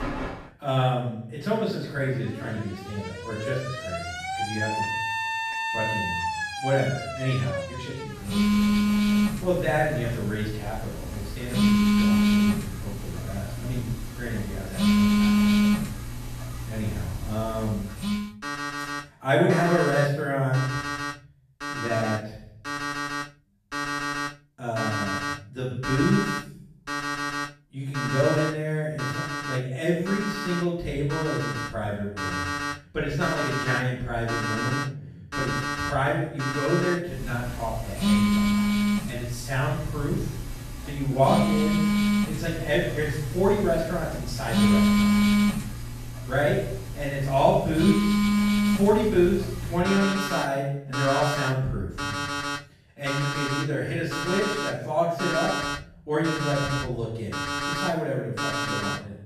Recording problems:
off-mic speech; far
room echo; noticeable; dies away in 0.7 s
alarms or sirens; very loud; throughout; as loud as the speech

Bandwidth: 14.5 kHz